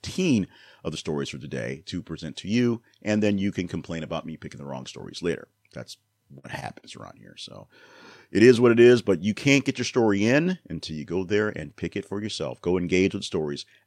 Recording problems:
none

